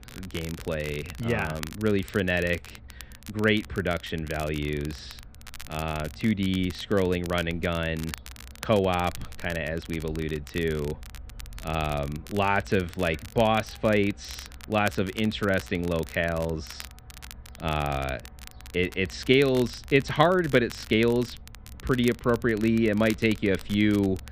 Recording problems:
muffled; very; fading above 3 kHz
crackle, like an old record; noticeable; 20 dB below the speech
animal sounds; faint; throughout; 20 dB below the speech

